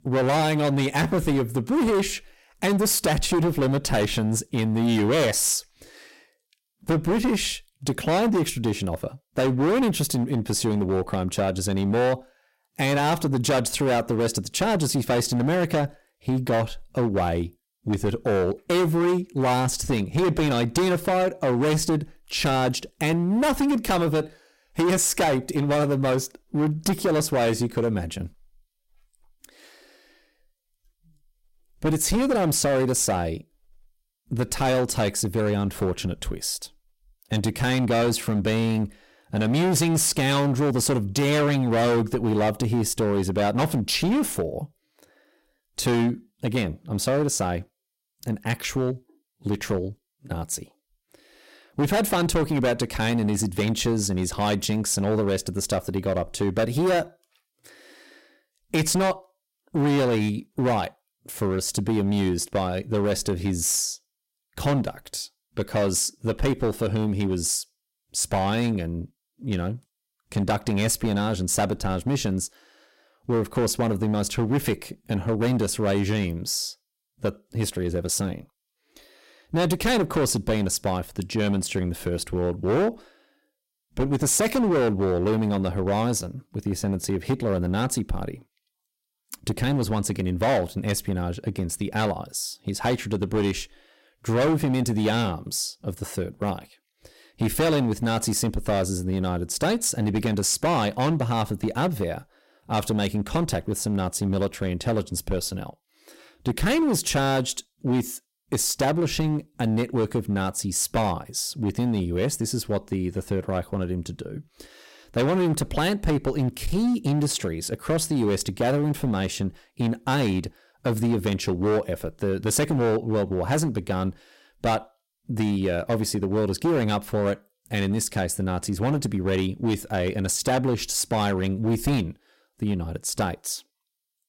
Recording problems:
distortion; heavy; 12% of the sound clipped

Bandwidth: 16 kHz